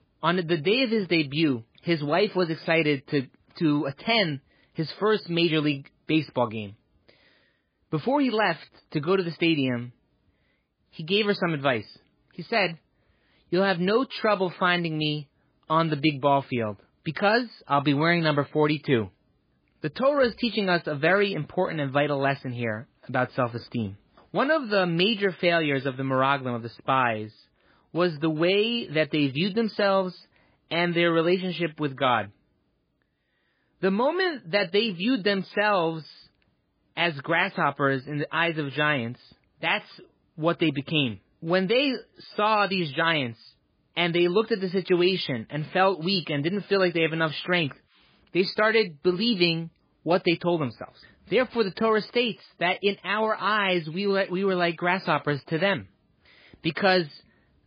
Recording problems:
garbled, watery; badly; nothing above 5 kHz

